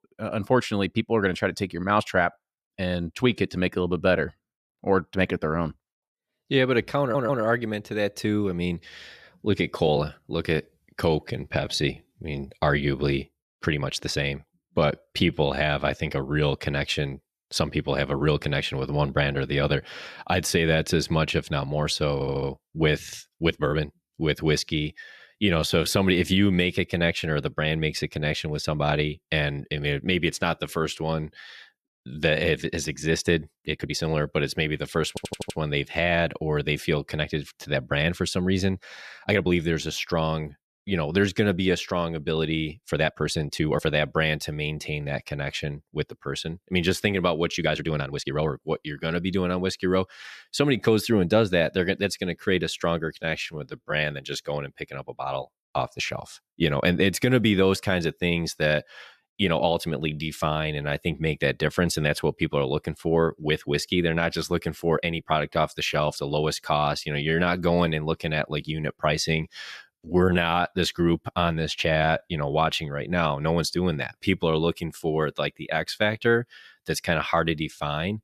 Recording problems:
audio stuttering; at 7 s, at 22 s and at 35 s
uneven, jittery; strongly; from 9.5 s to 1:15

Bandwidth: 14.5 kHz